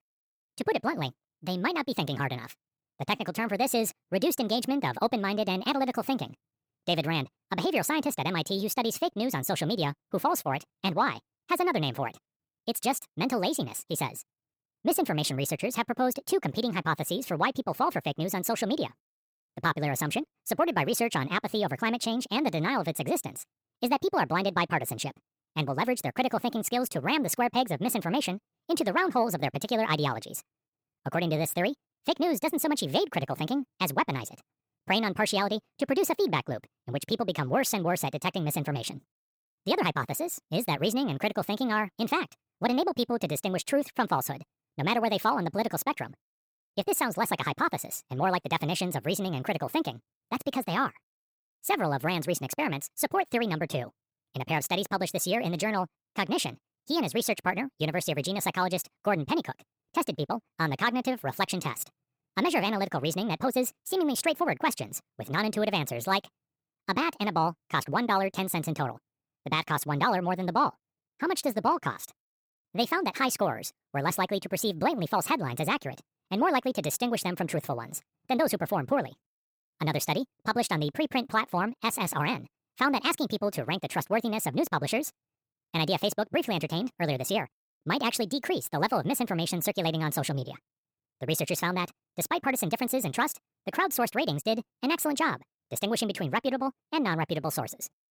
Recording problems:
wrong speed and pitch; too fast and too high; 1.5 times normal speed

